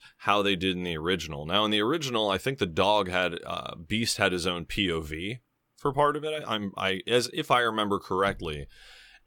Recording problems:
none

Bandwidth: 17 kHz